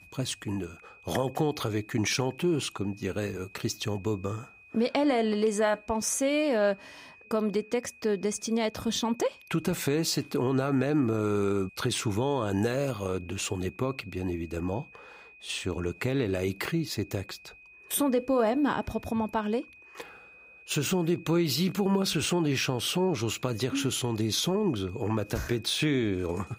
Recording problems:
high-pitched whine; faint; throughout; 2.5 kHz, 20 dB below the speech

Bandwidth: 15.5 kHz